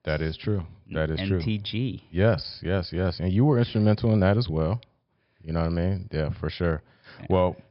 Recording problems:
high frequencies cut off; noticeable; nothing above 5.5 kHz

